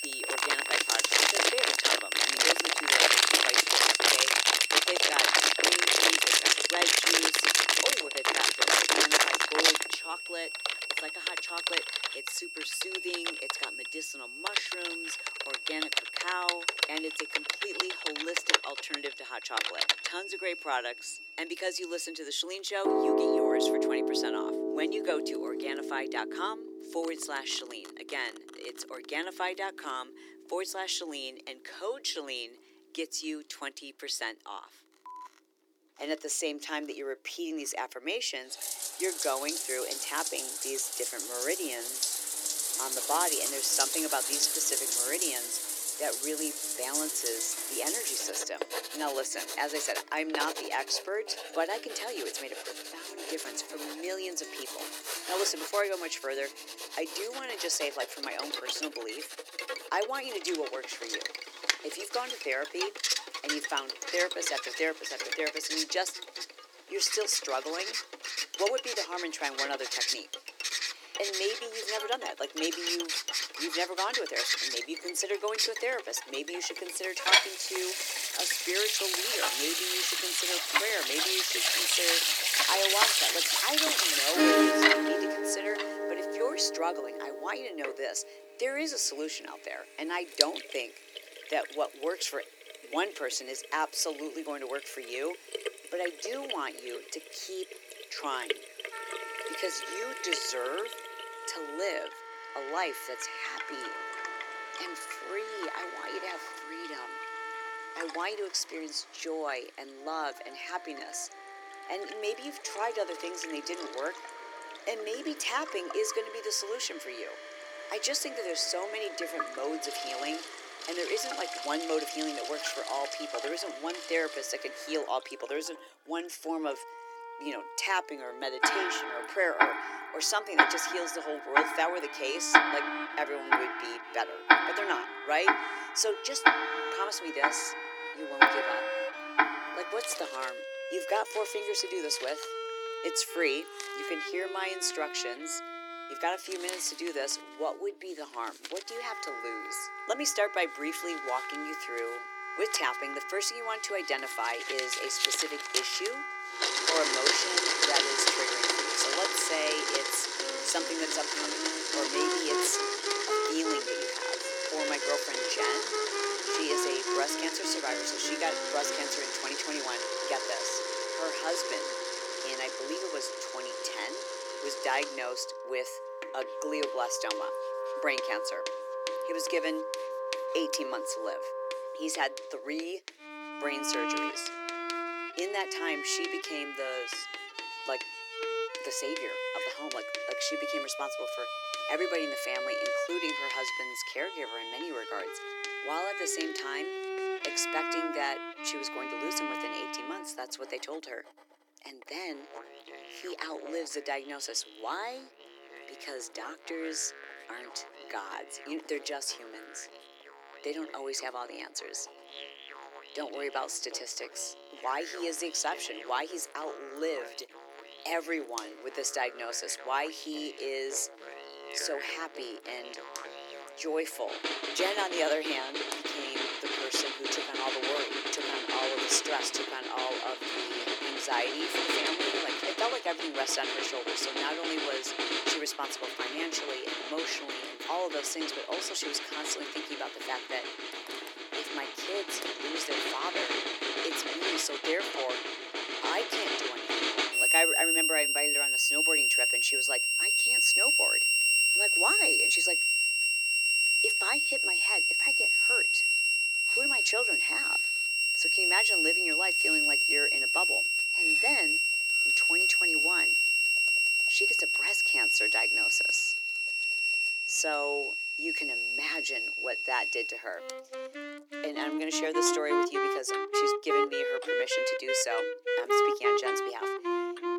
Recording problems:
thin; somewhat; fading below 300 Hz
household noises; very loud; throughout; 6 dB above the speech
background music; very loud; throughout; 4 dB above the speech

